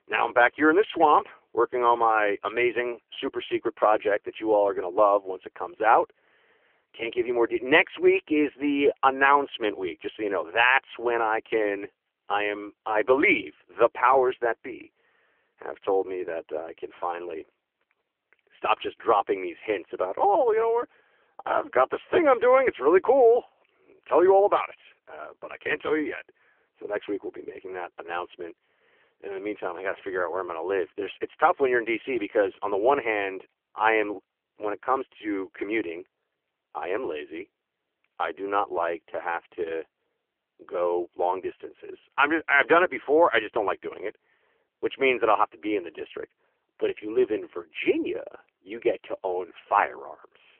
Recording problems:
phone-call audio; poor line; nothing above 3 kHz

